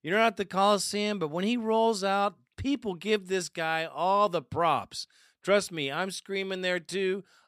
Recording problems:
none

